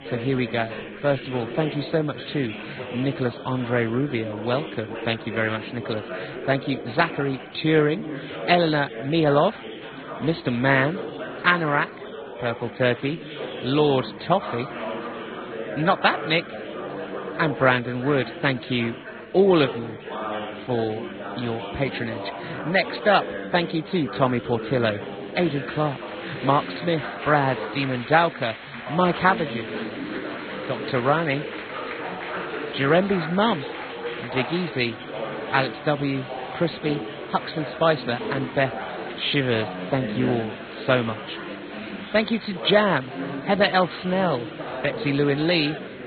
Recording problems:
garbled, watery; badly; nothing above 4 kHz
chatter from many people; loud; throughout; 10 dB below the speech

